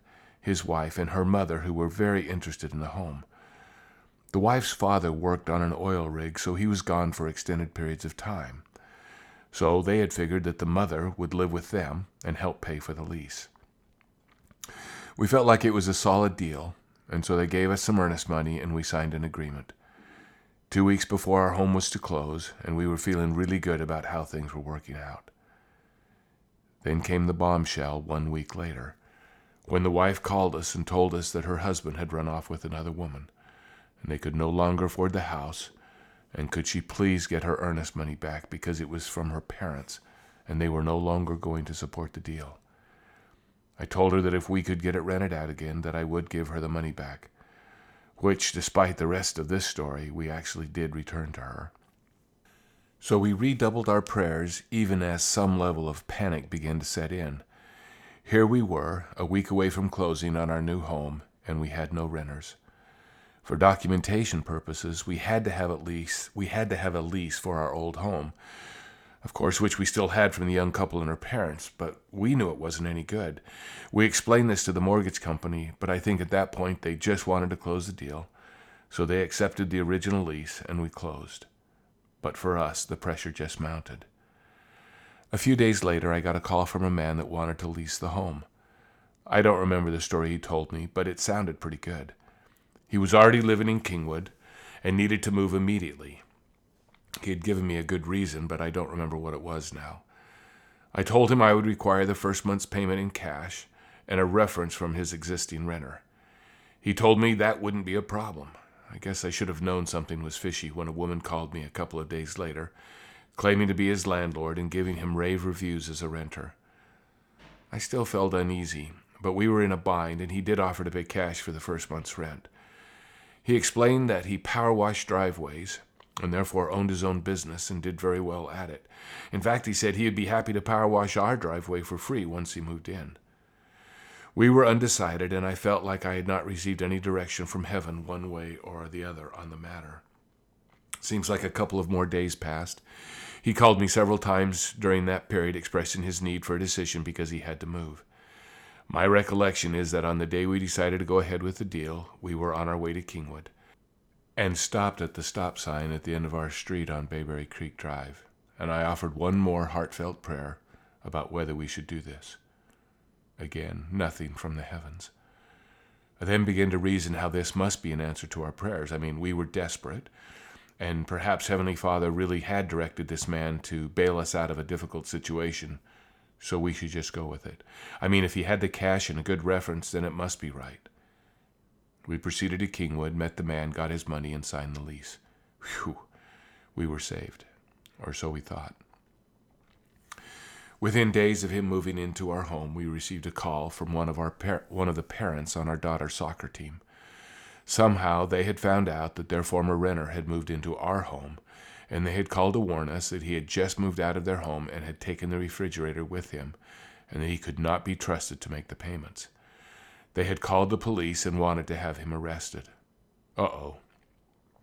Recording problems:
none

